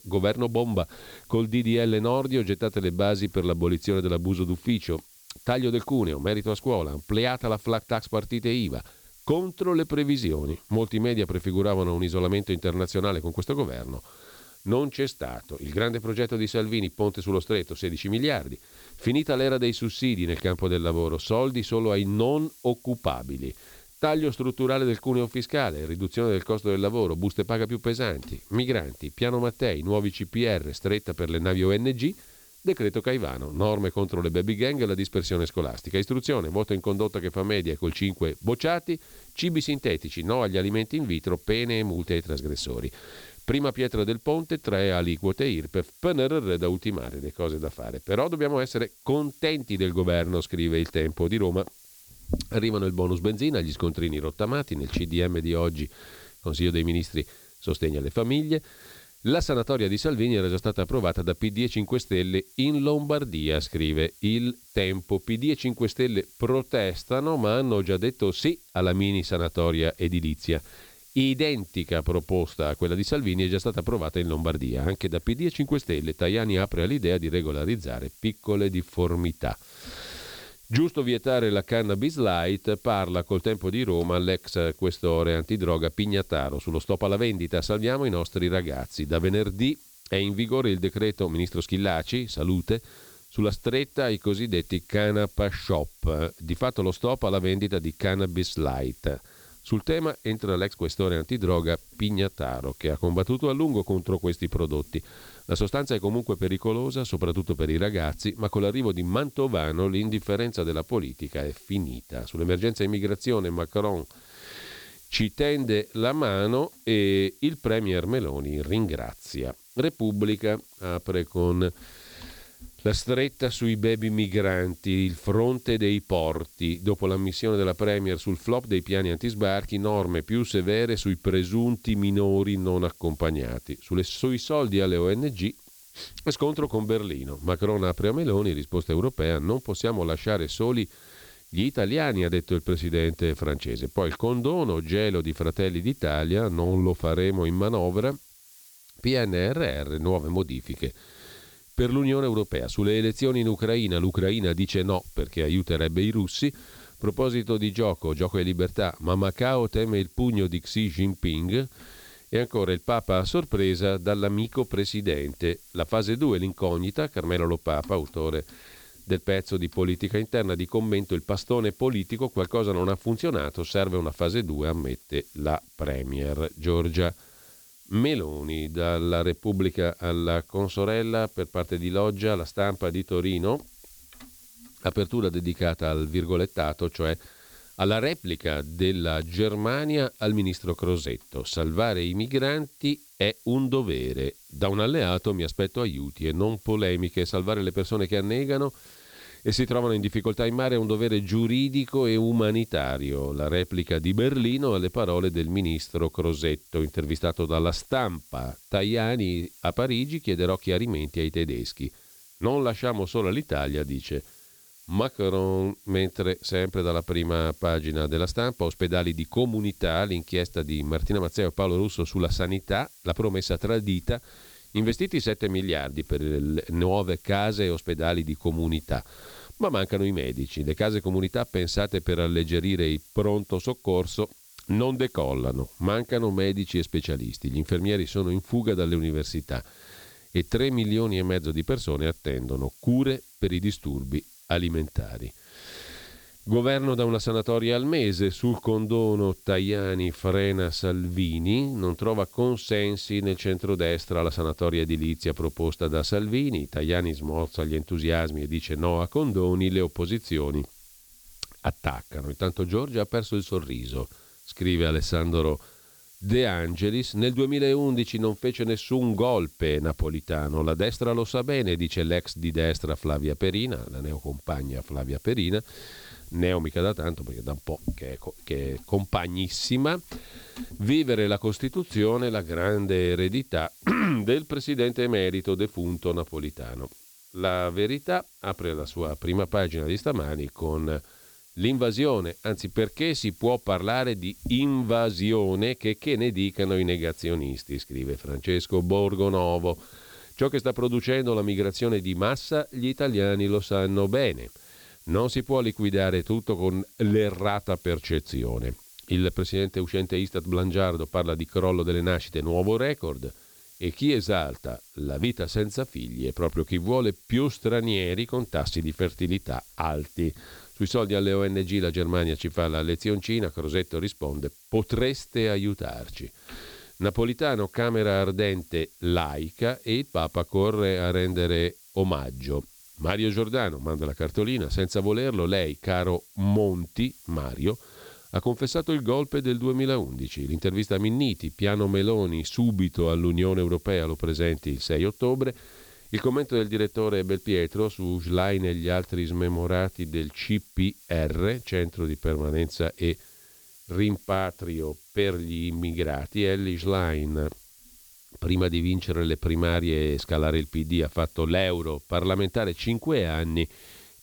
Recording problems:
hiss; faint; throughout; 25 dB below the speech

